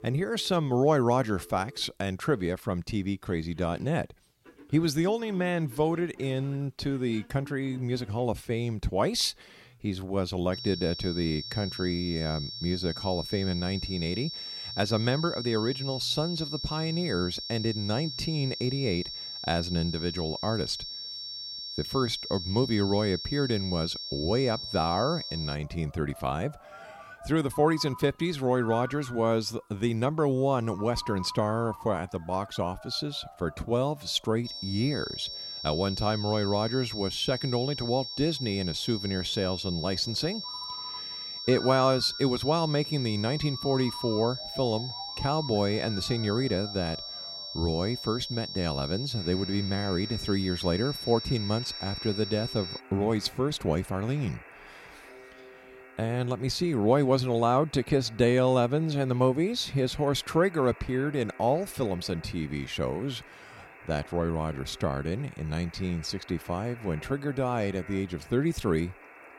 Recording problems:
high-pitched whine; loud; from 11 to 26 s and from 34 to 53 s; 5.5 kHz, 7 dB below the speech
alarms or sirens; noticeable; throughout; 20 dB below the speech

